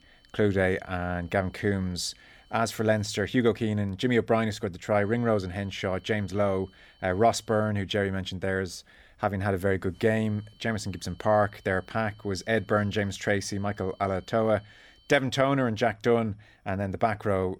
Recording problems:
high-pitched whine; faint; until 3.5 s, from 5 to 7.5 s and from 10 to 15 s; 3 kHz, 30 dB below the speech

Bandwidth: 18.5 kHz